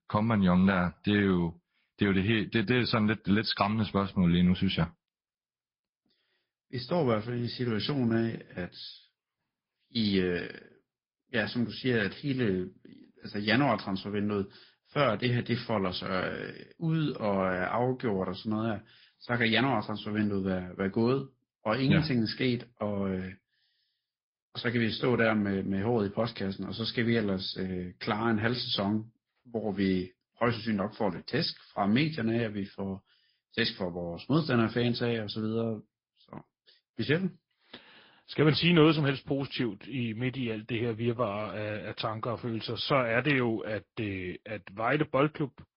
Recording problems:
high frequencies cut off; noticeable; nothing above 5 kHz
garbled, watery; slightly

